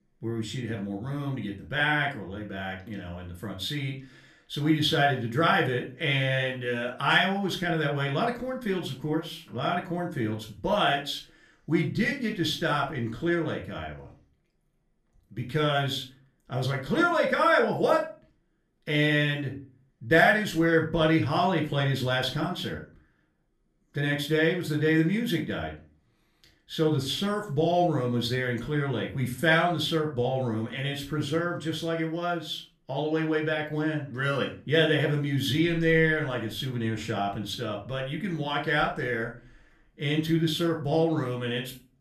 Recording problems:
off-mic speech; far
room echo; slight; dies away in 0.3 s

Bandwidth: 14.5 kHz